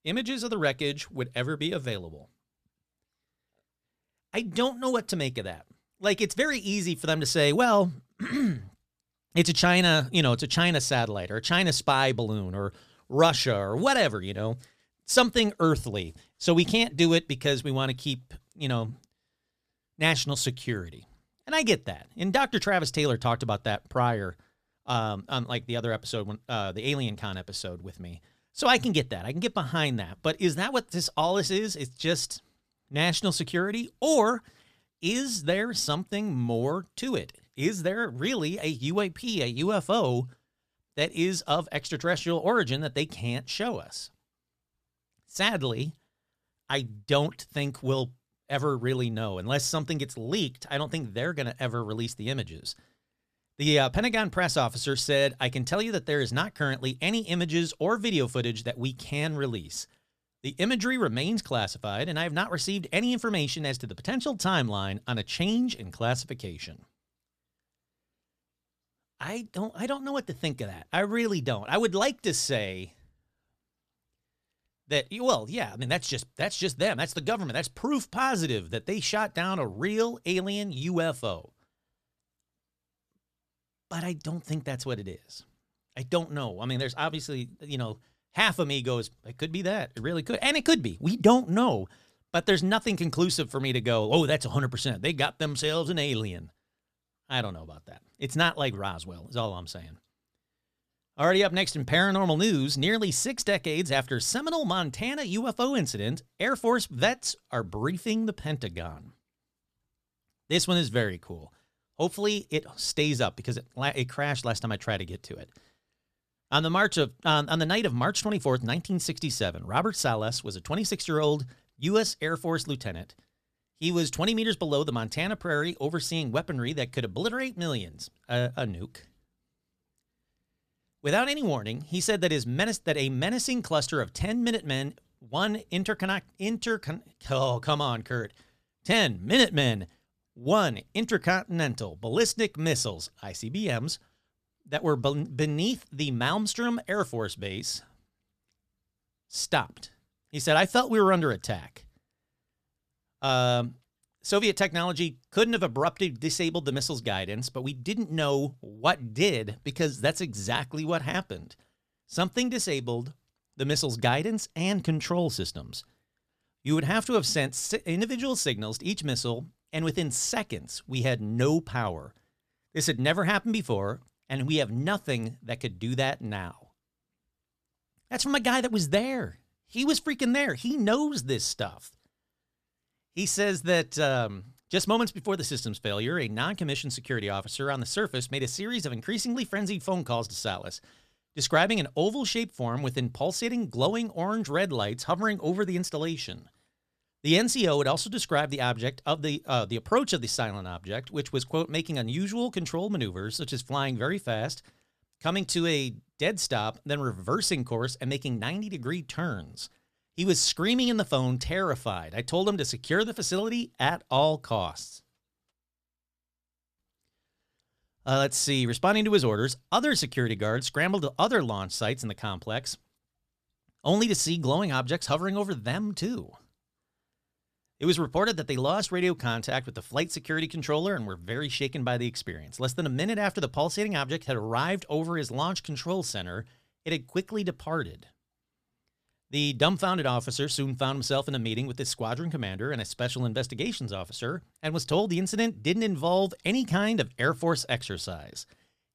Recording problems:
none

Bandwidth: 14.5 kHz